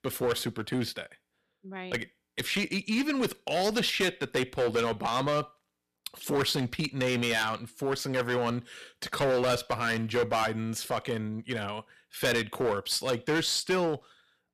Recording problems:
distortion; heavy; 8% of the sound clipped

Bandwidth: 14.5 kHz